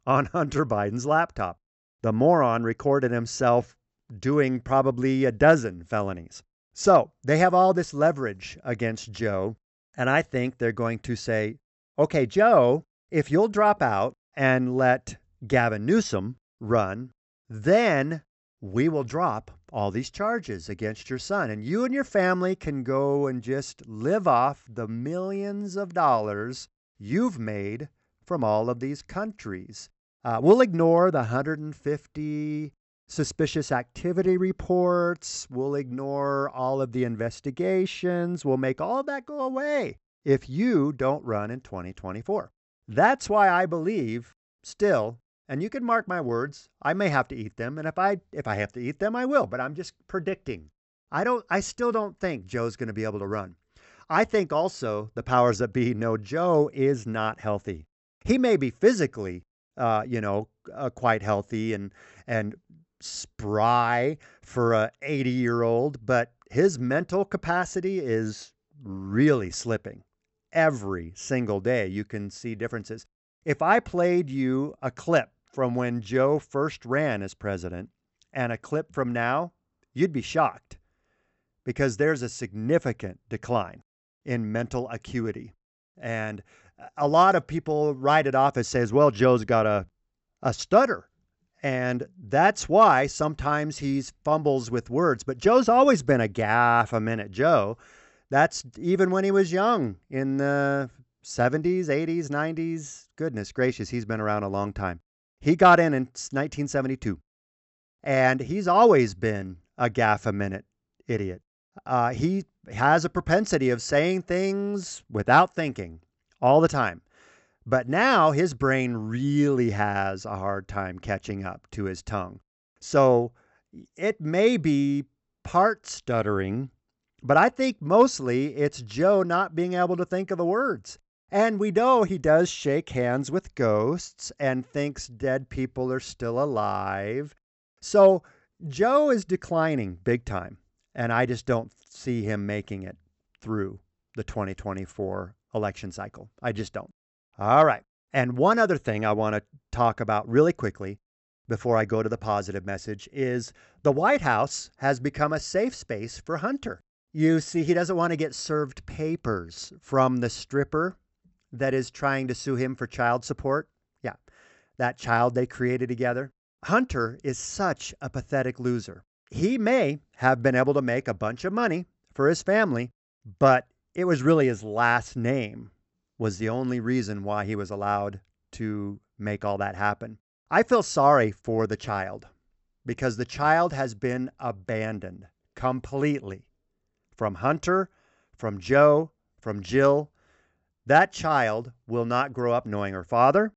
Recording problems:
high frequencies cut off; noticeable; nothing above 8 kHz

